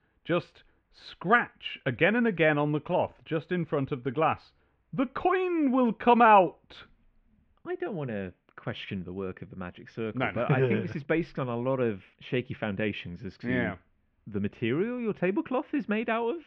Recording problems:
muffled; very; fading above 2.5 kHz

